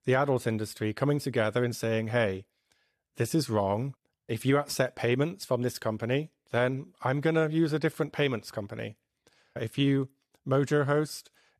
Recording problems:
none

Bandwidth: 13.5 kHz